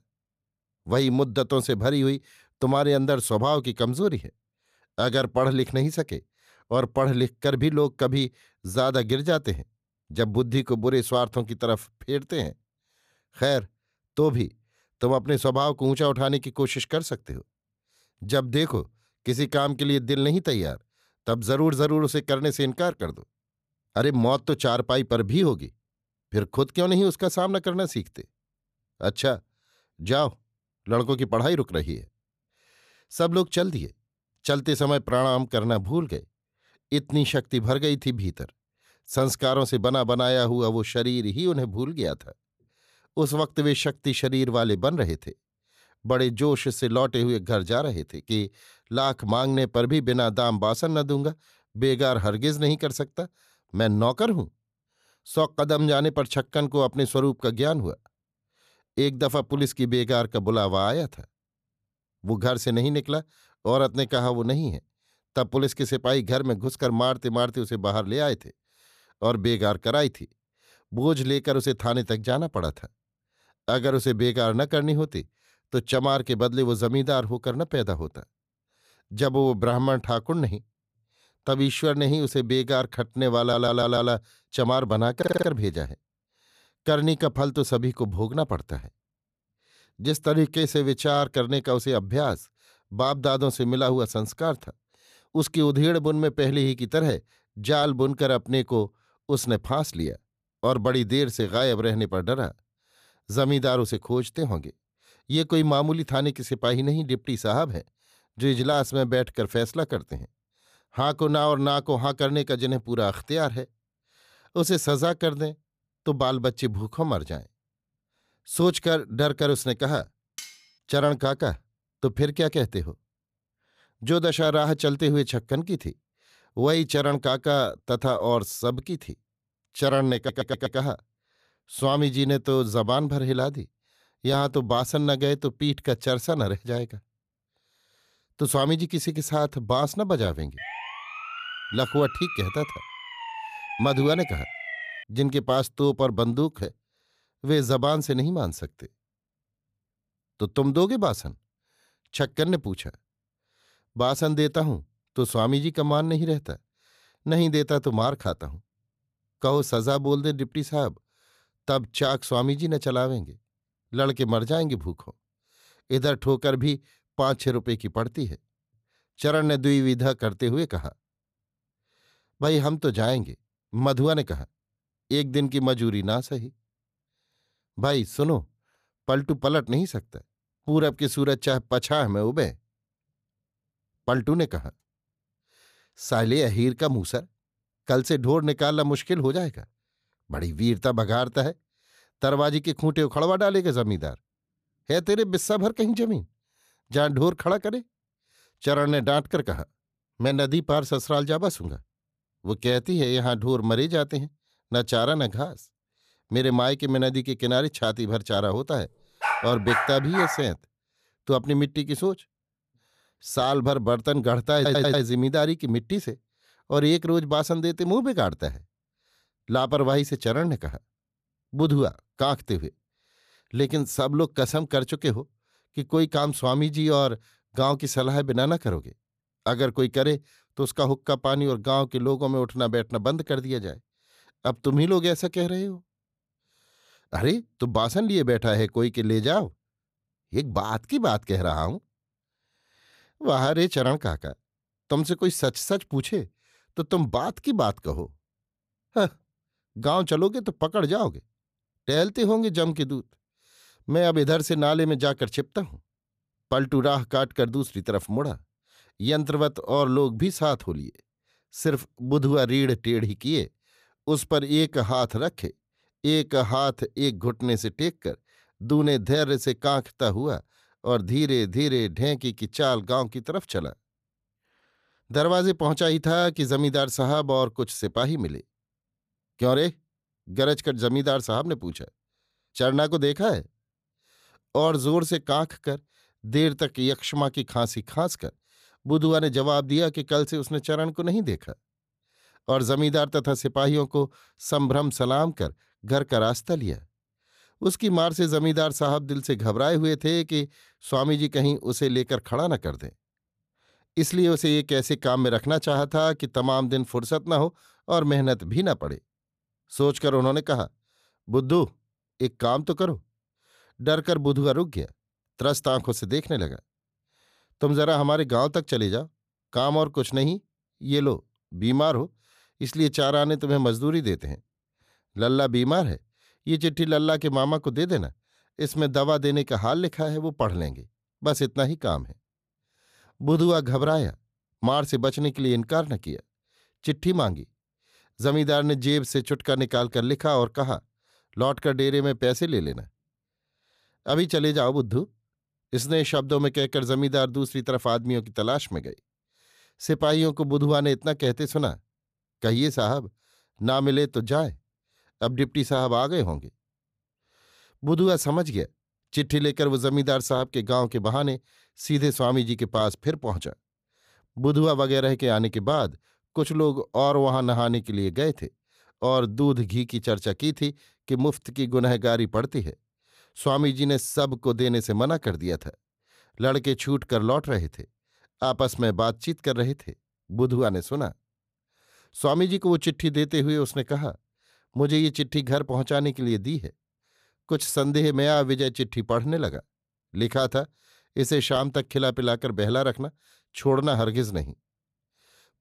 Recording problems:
audio stuttering; 4 times, first at 1:23
clattering dishes; faint; at 2:00; peak 15 dB below the speech
siren; noticeable; from 2:21 to 2:25; peak 8 dB below the speech
dog barking; noticeable; from 3:29 to 3:30; peak 1 dB below the speech

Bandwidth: 14.5 kHz